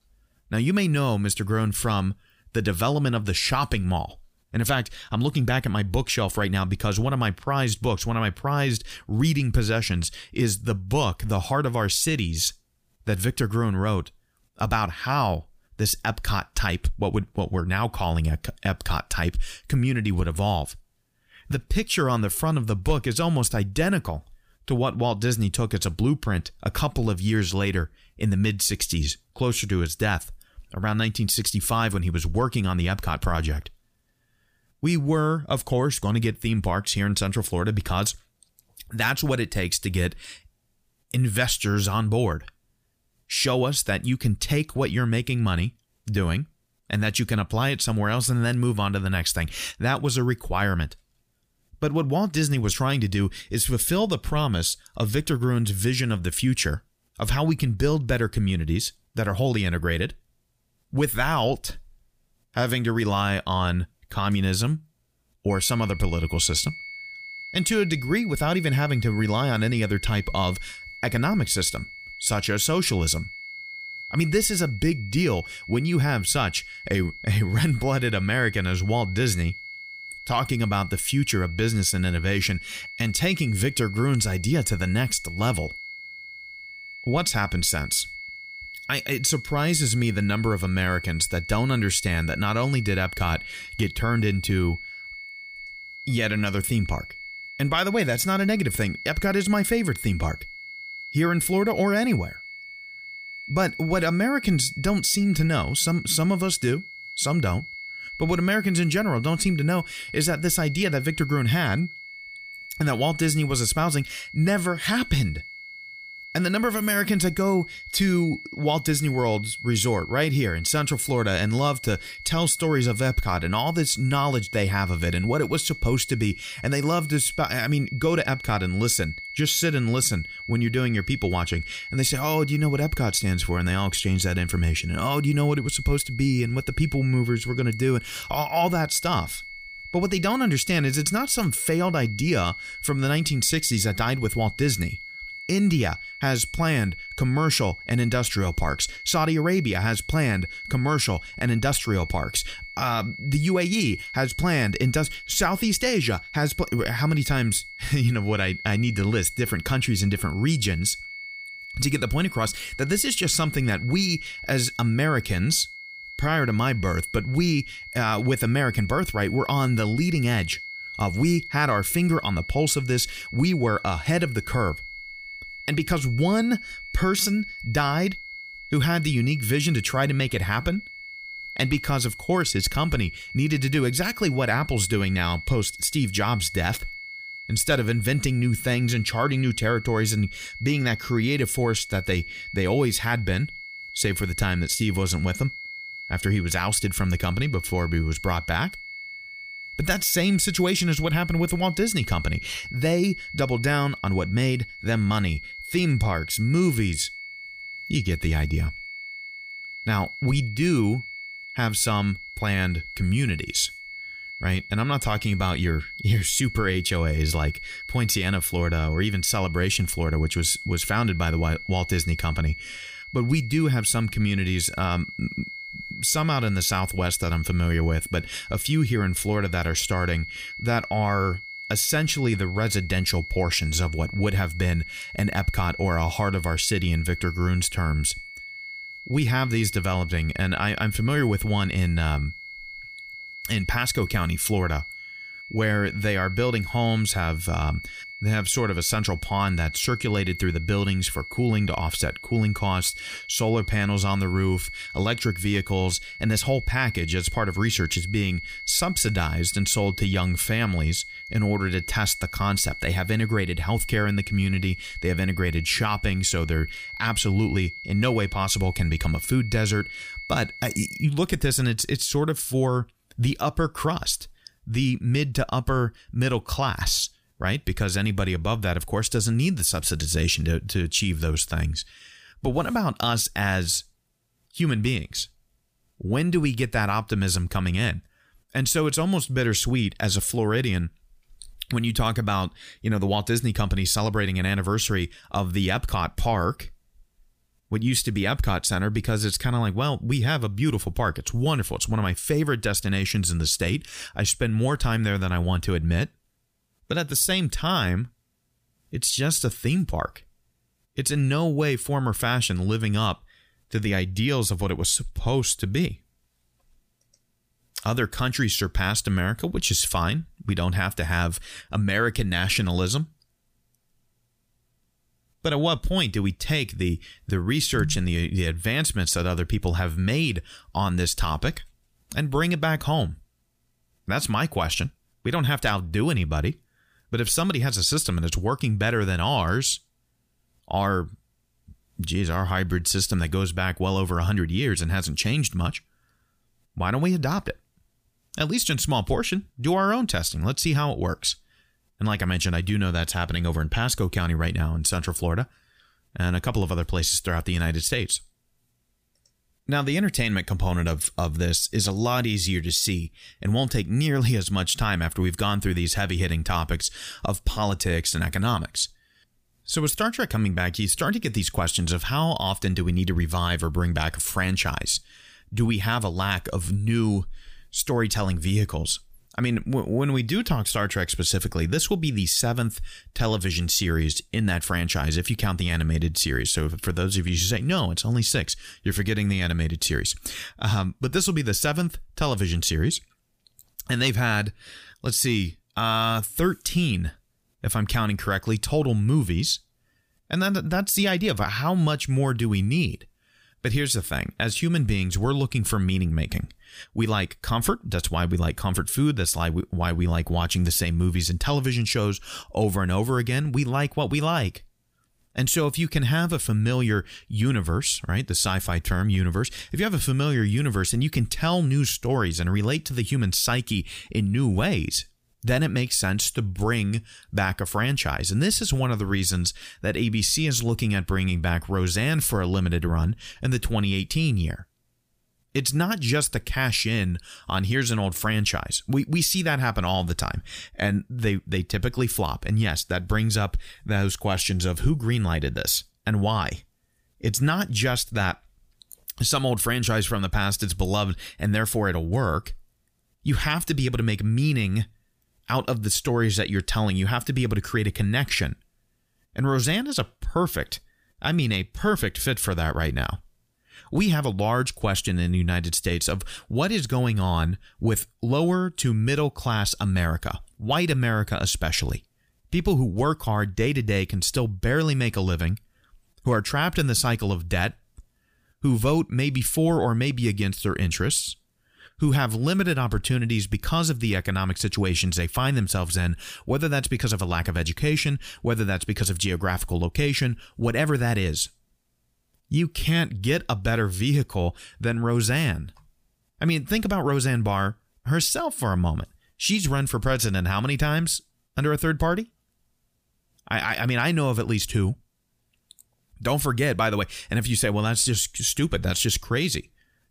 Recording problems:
high-pitched whine; noticeable; from 1:06 to 4:31; 2 kHz, 10 dB below the speech

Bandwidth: 15 kHz